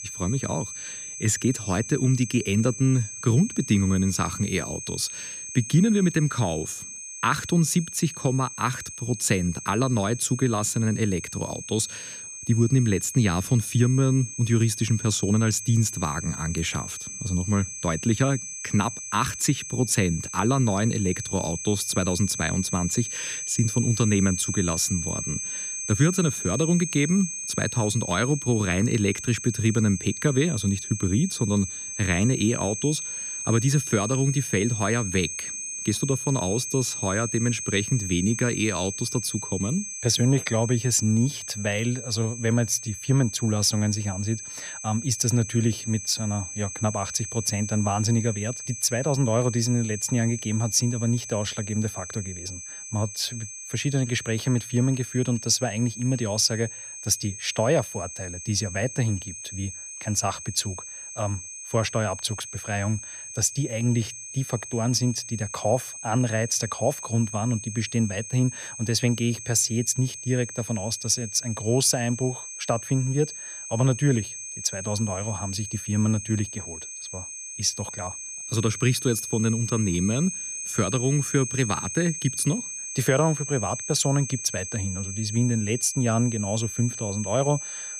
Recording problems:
high-pitched whine; loud; throughout; 6.5 kHz, 8 dB below the speech

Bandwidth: 14.5 kHz